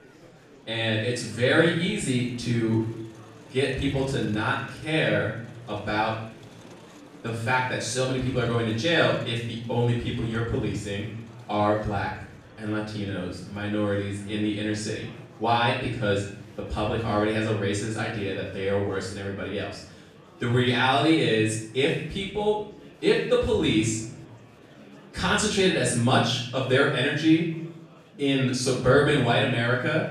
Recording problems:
off-mic speech; far
room echo; noticeable; dies away in 0.7 s
murmuring crowd; faint; throughout; 25 dB below the speech

